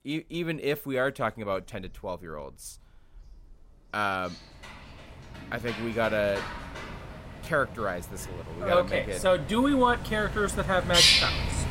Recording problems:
animal sounds; very loud; throughout; 1 dB above the speech

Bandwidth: 16 kHz